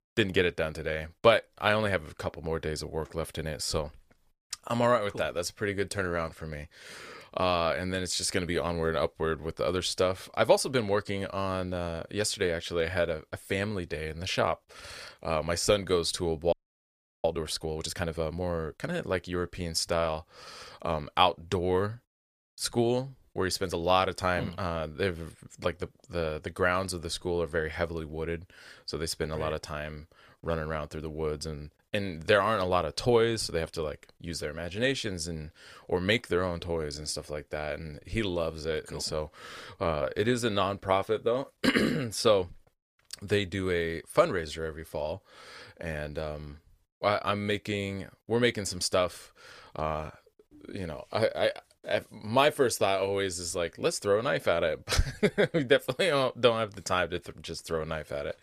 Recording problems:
audio freezing; at 17 s for 0.5 s

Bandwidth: 15 kHz